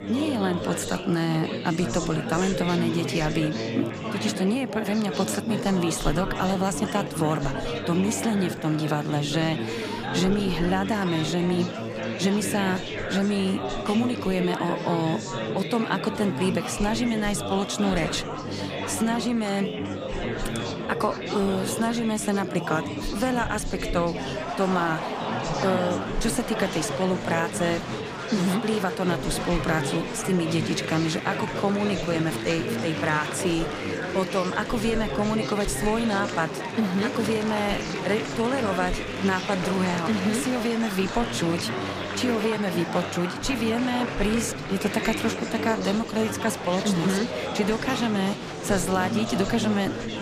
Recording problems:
murmuring crowd; loud; throughout; 4 dB below the speech

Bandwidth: 15 kHz